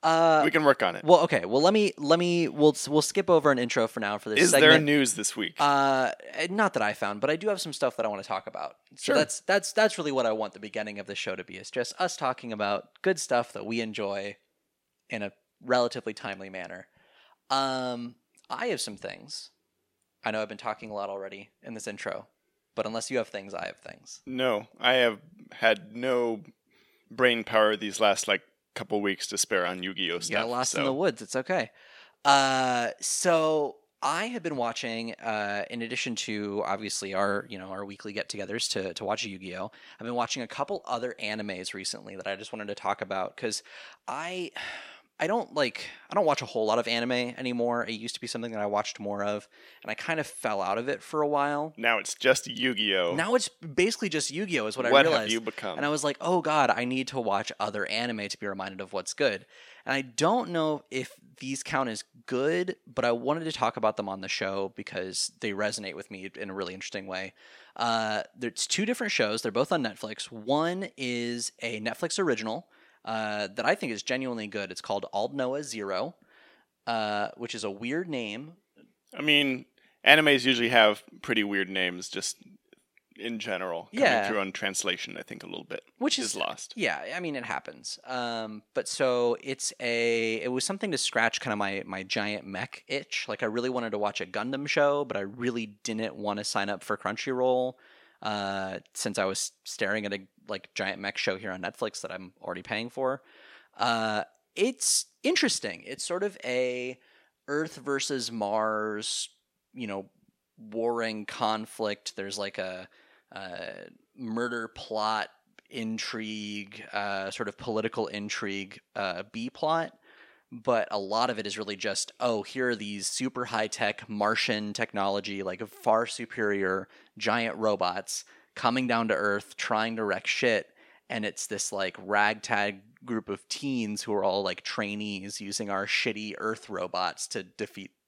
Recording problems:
thin; very slightly; fading below 950 Hz

